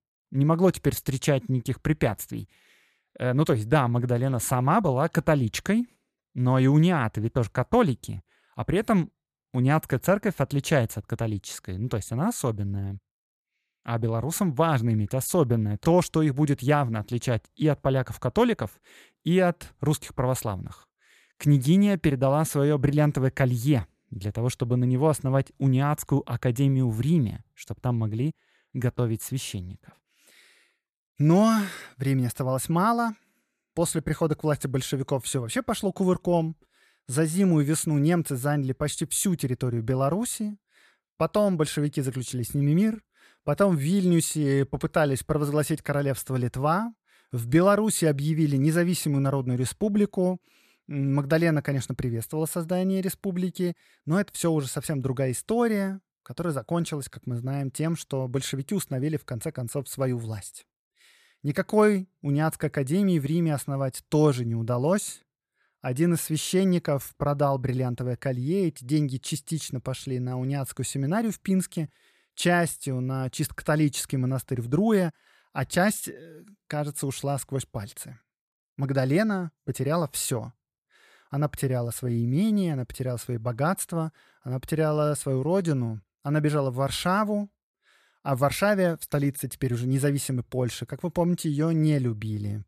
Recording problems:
none

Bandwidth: 14.5 kHz